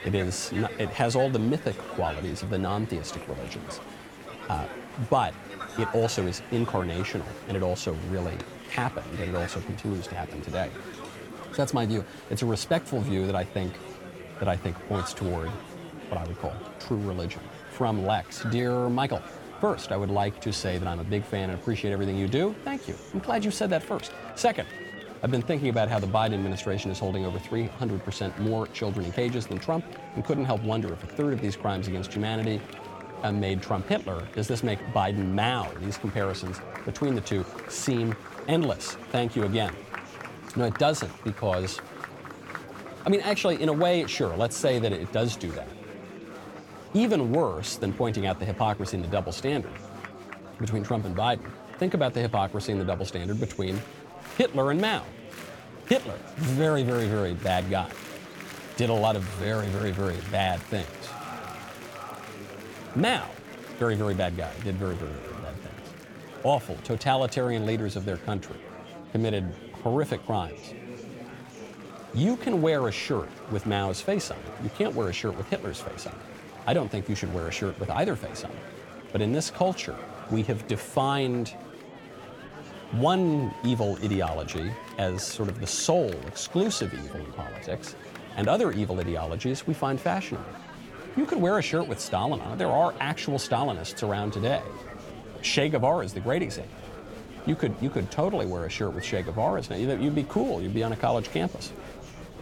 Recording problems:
murmuring crowd; noticeable; throughout; 15 dB below the speech

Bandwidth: 17 kHz